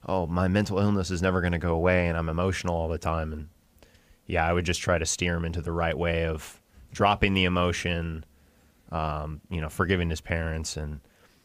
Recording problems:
none

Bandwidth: 15 kHz